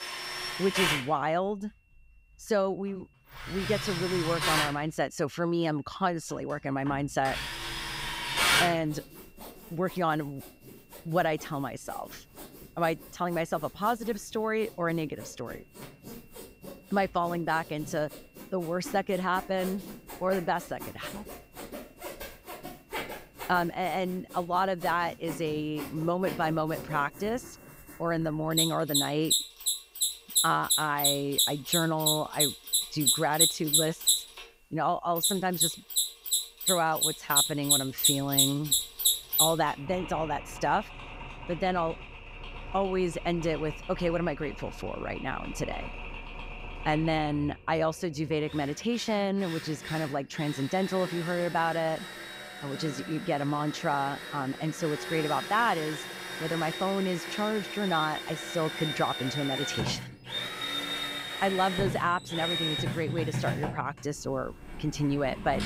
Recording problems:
machinery noise; very loud; throughout; 1 dB above the speech
high-pitched whine; faint; throughout; 2.5 kHz, 35 dB below the speech

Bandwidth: 15.5 kHz